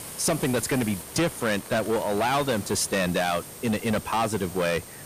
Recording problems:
distortion; heavy; 14% of the sound clipped
hiss; noticeable; throughout; 15 dB below the speech
high-pitched whine; faint; throughout; 8.5 kHz, 20 dB below the speech

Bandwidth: 15 kHz